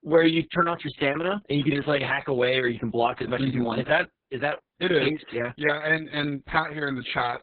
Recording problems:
garbled, watery; badly; nothing above 4 kHz

